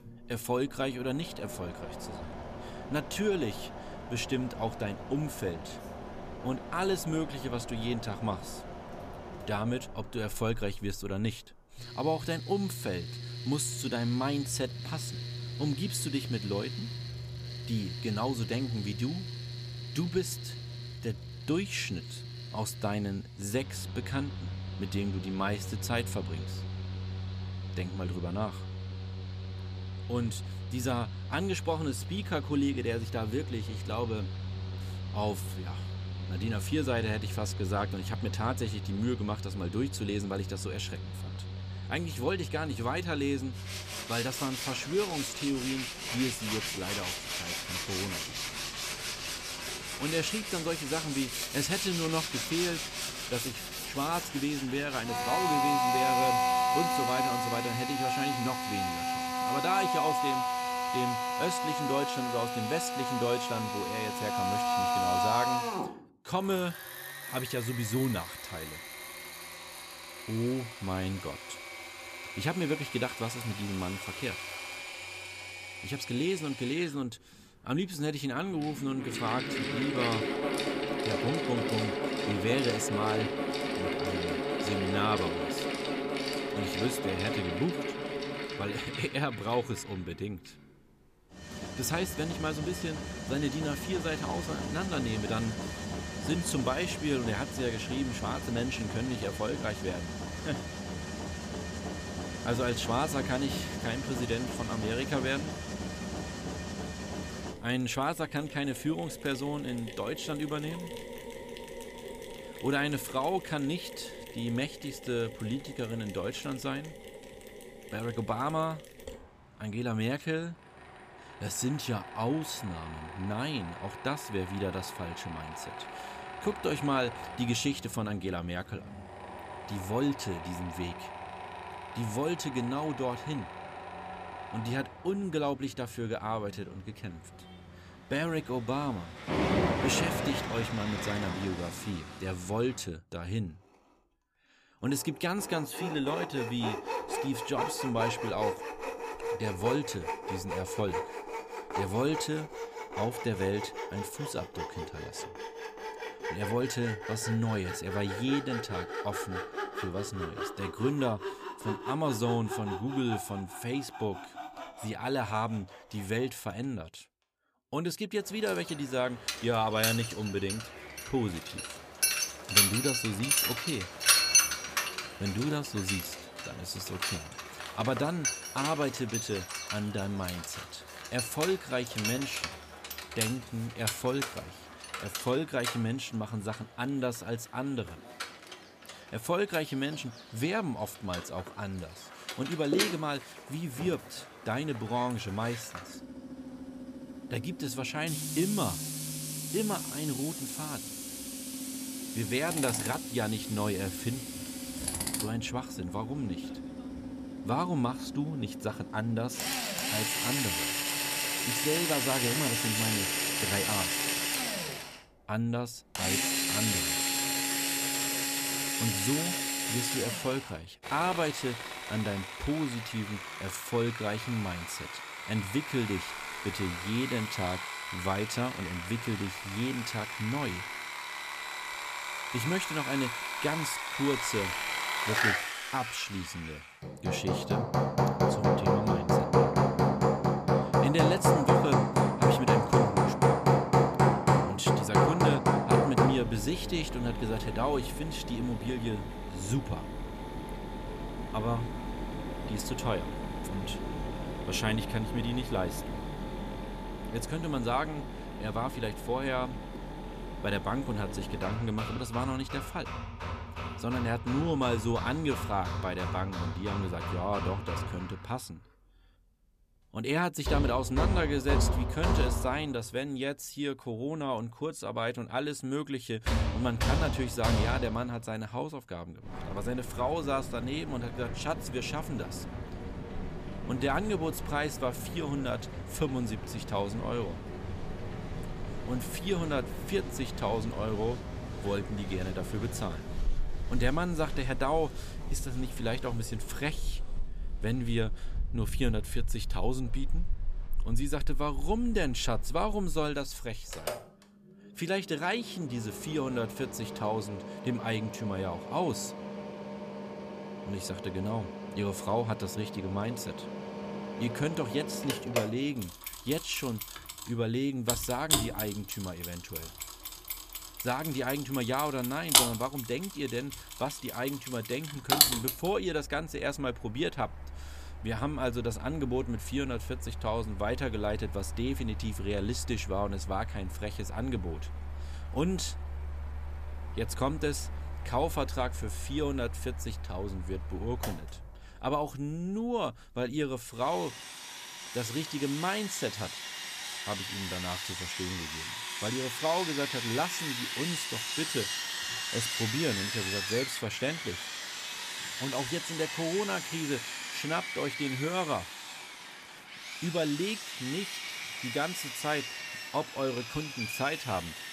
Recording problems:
machinery noise; loud; throughout; as loud as the speech

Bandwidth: 14.5 kHz